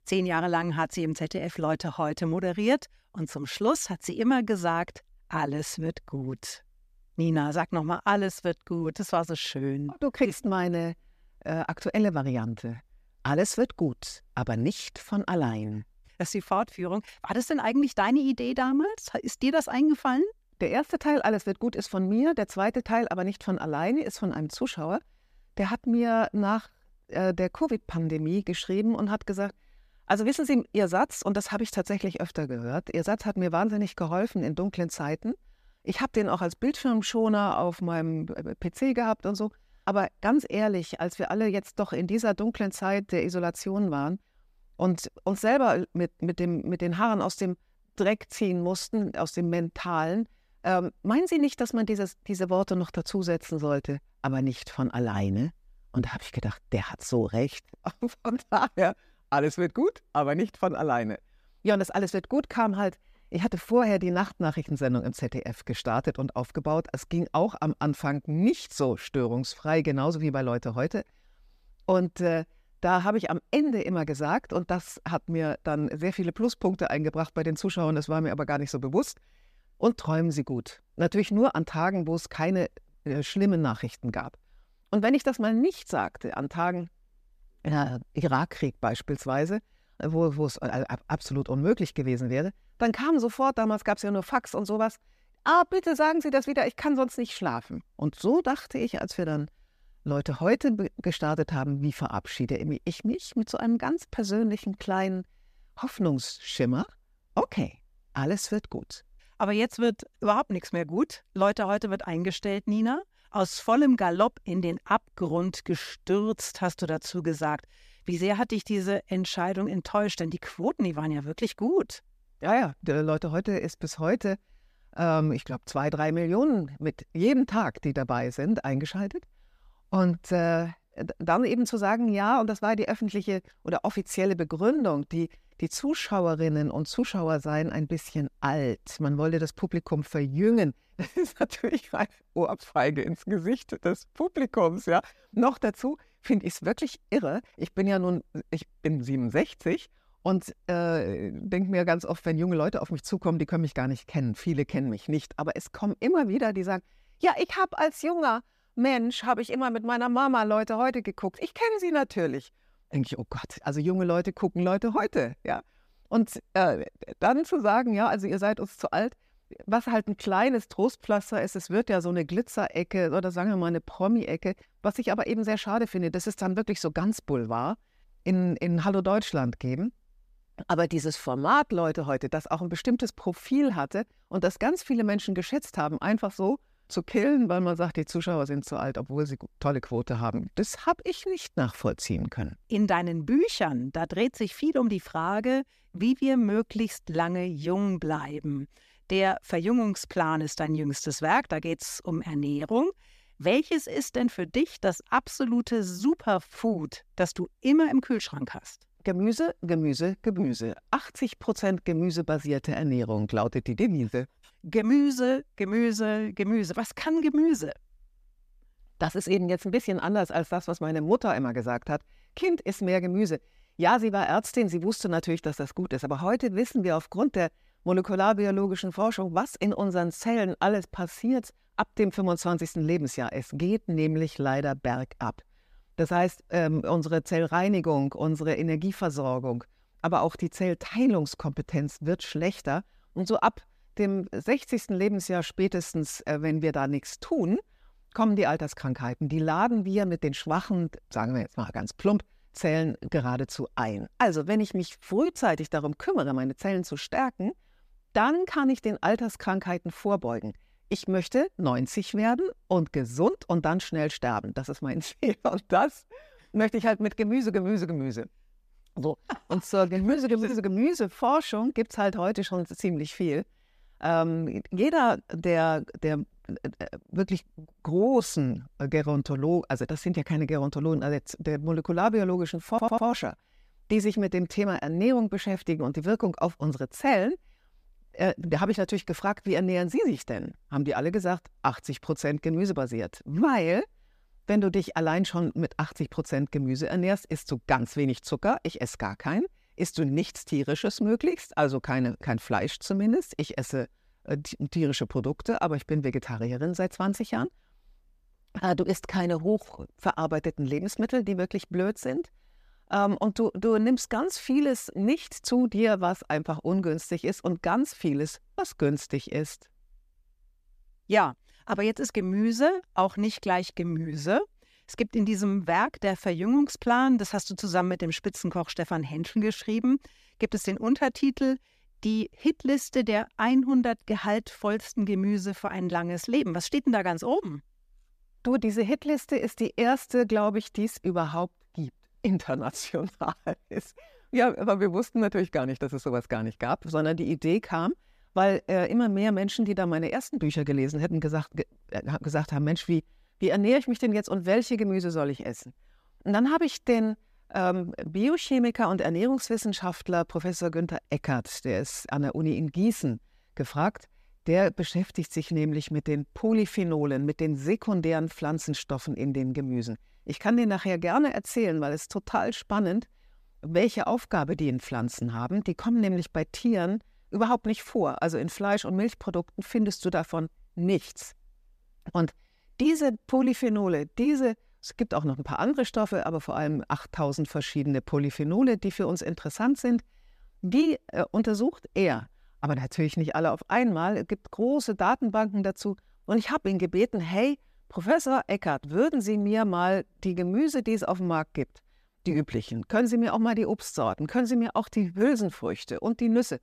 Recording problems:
audio stuttering; at 4:43

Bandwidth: 14.5 kHz